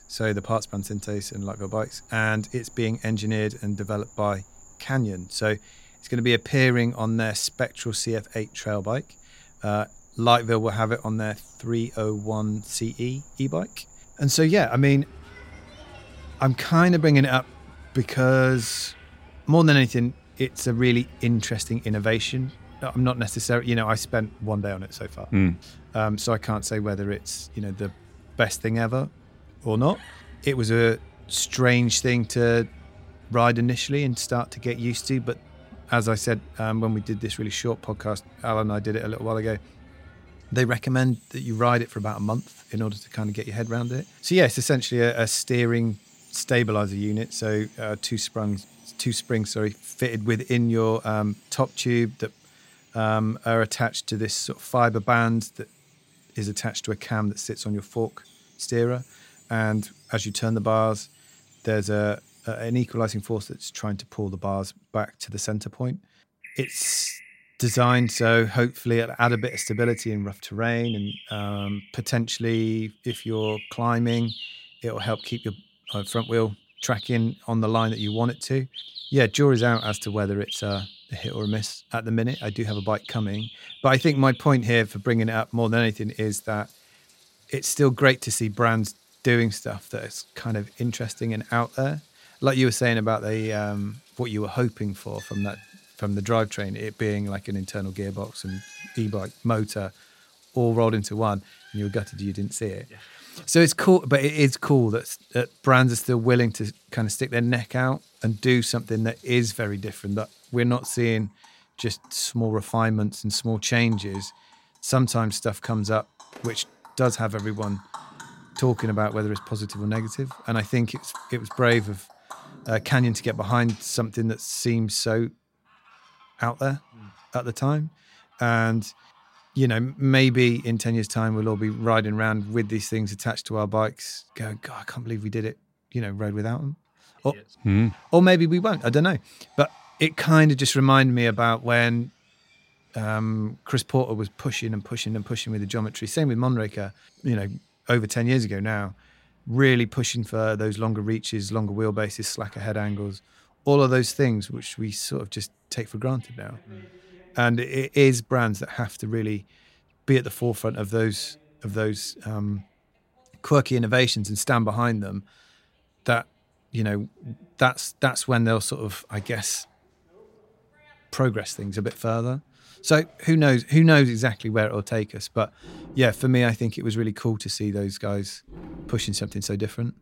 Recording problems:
animal sounds; faint; throughout; 20 dB below the speech

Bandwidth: 16 kHz